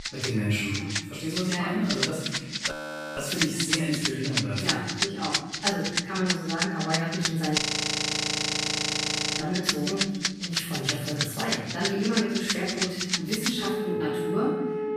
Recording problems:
room echo; strong; dies away in 1.1 s
off-mic speech; far
background music; very loud; throughout; 1 dB above the speech
audio freezing; at 2.5 s and at 7.5 s for 2 s

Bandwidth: 14.5 kHz